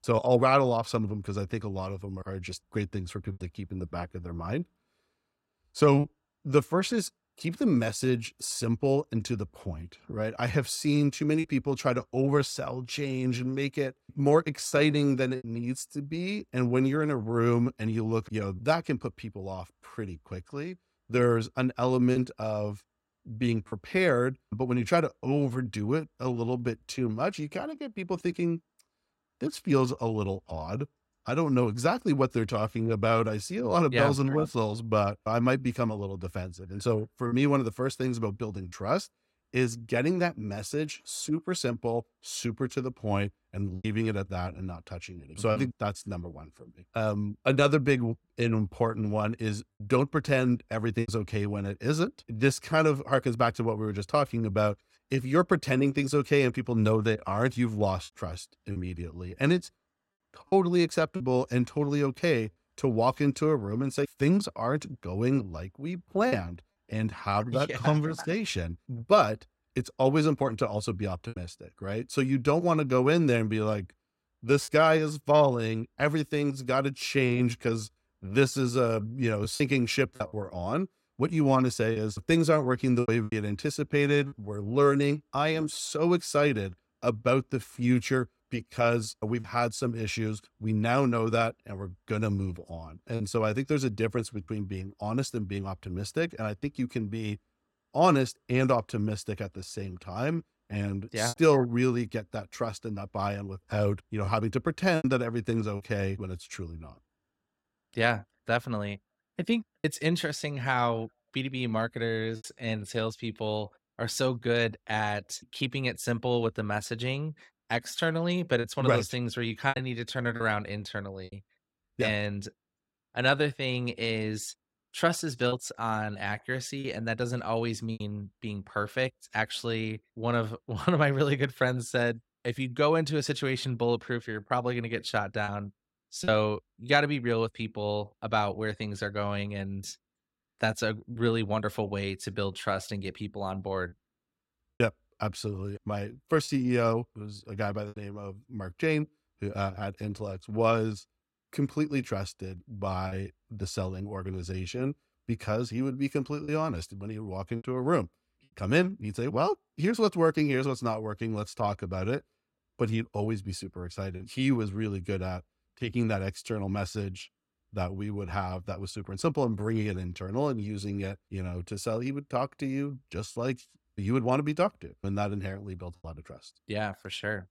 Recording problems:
choppy; occasionally; 2% of the speech affected

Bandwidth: 16 kHz